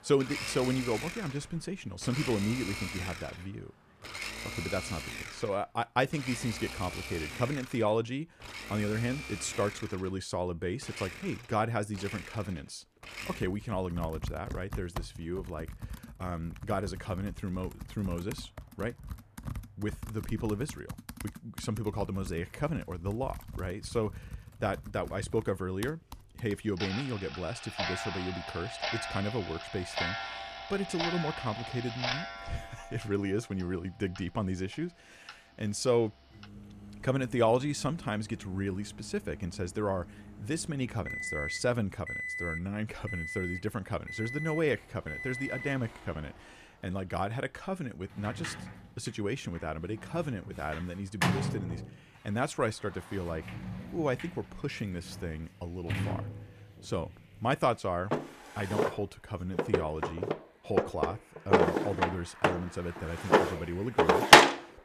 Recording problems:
household noises; very loud; throughout; 2 dB above the speech
traffic noise; faint; throughout; 25 dB below the speech

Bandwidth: 14.5 kHz